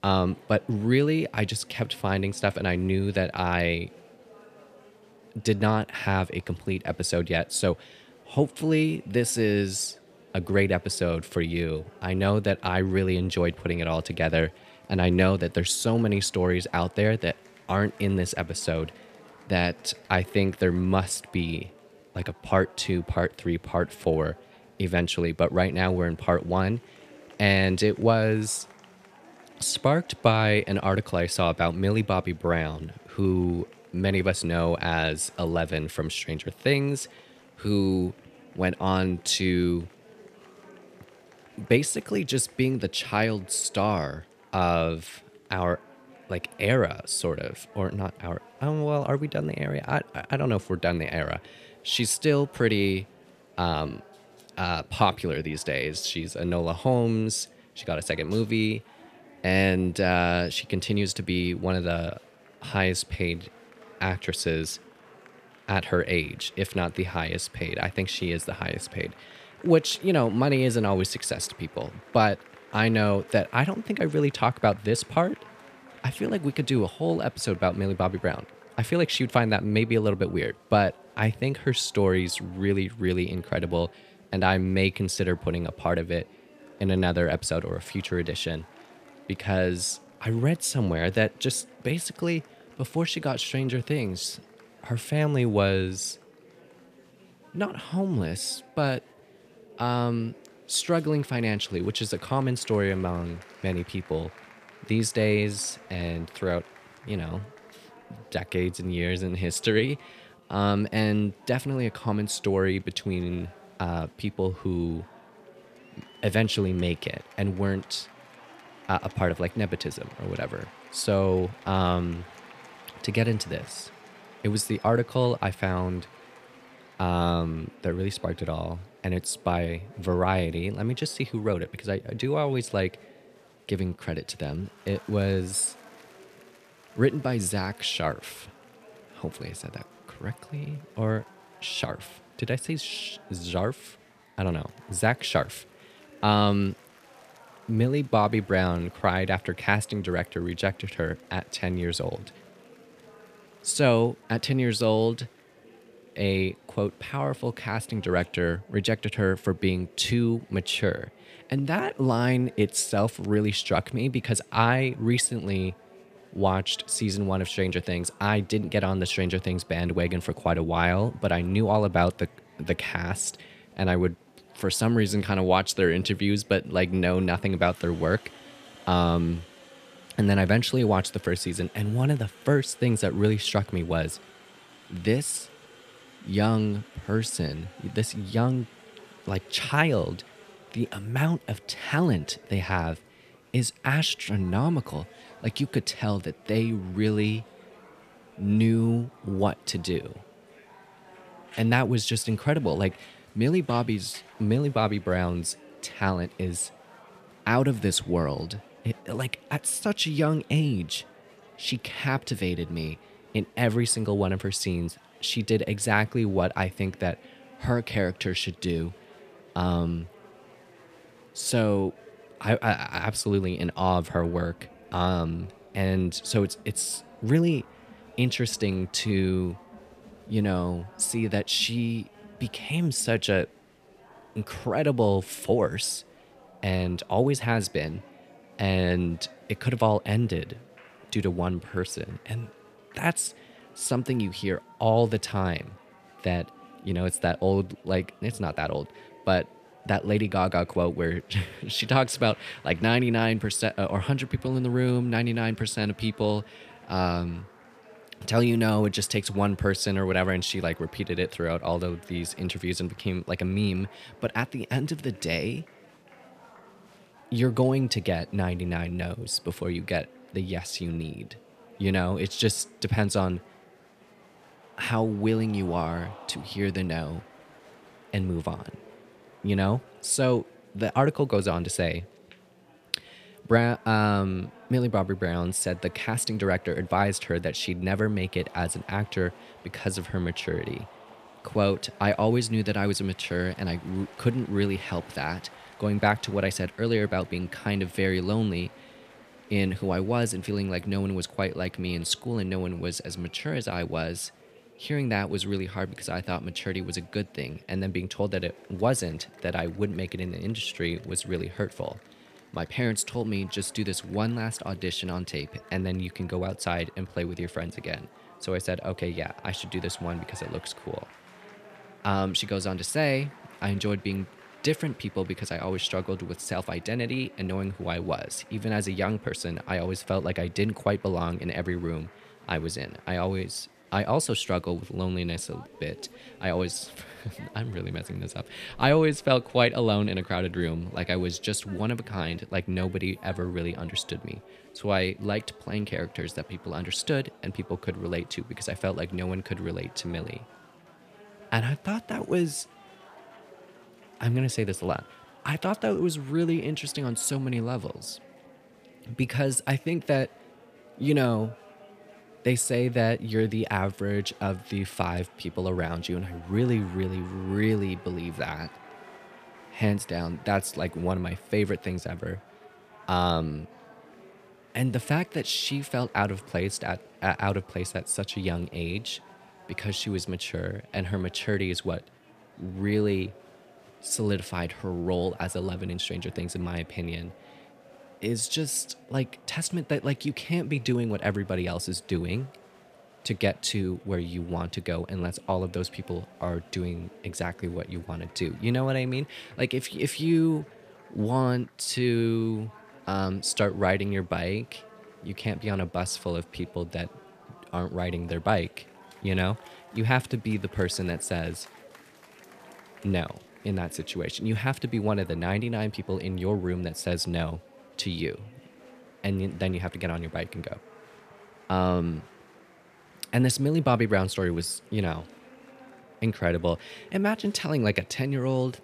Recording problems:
murmuring crowd; faint; throughout; 25 dB below the speech

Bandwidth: 14.5 kHz